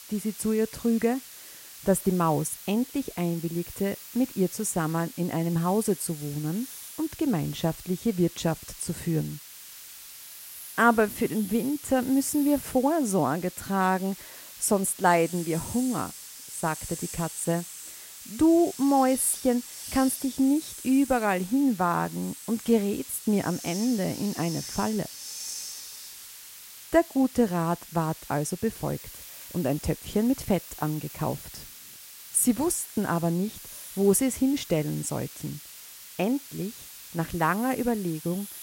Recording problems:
hiss; noticeable; throughout; 15 dB below the speech

